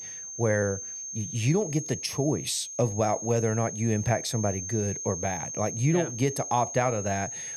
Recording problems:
high-pitched whine; loud; throughout; 6.5 kHz, 7 dB below the speech

